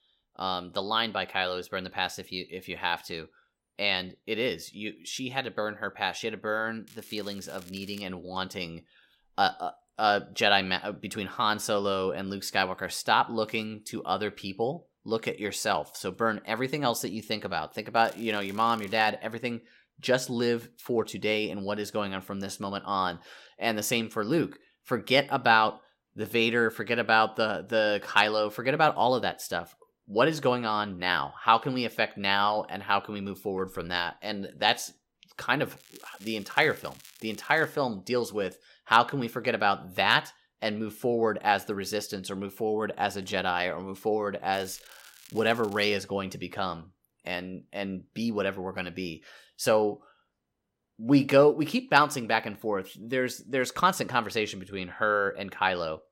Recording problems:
crackling; faint; 4 times, first at 7 s; 25 dB below the speech

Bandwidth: 16 kHz